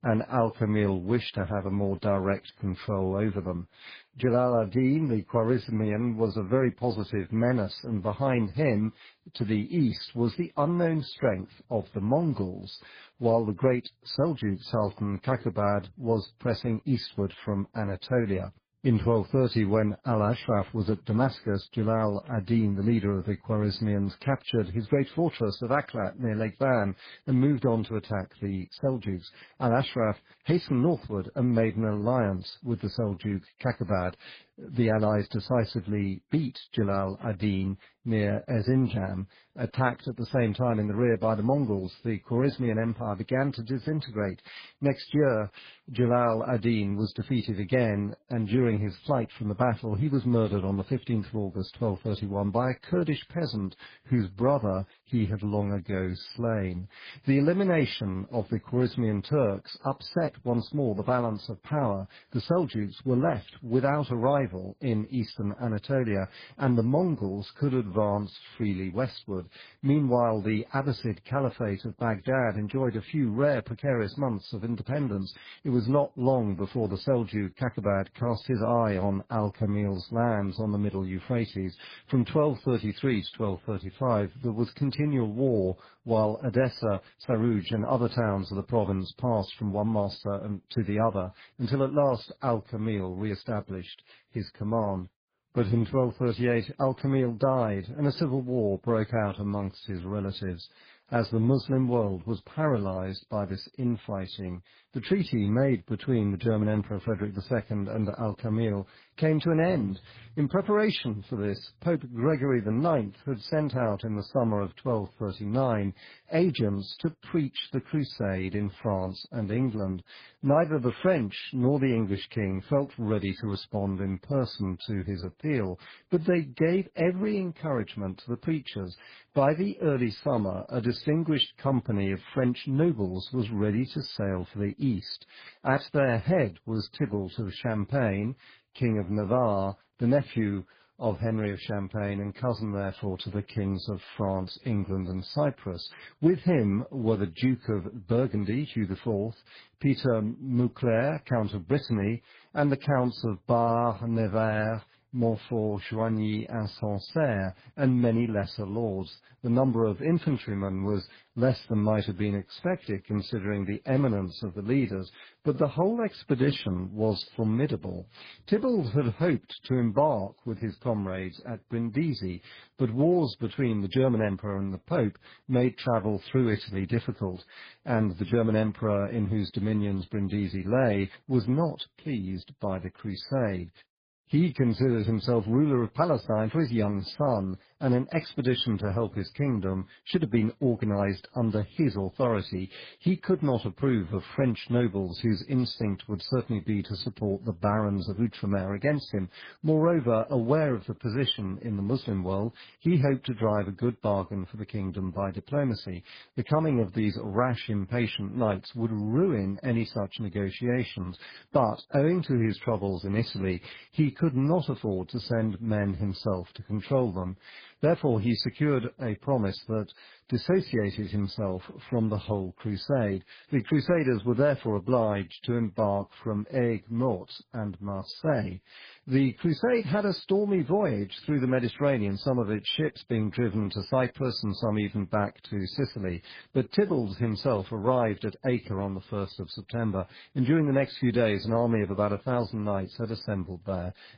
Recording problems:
garbled, watery; badly

